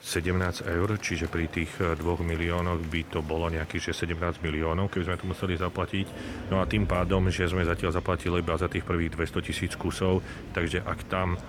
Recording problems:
traffic noise; noticeable; throughout; 10 dB below the speech
murmuring crowd; noticeable; throughout; 15 dB below the speech

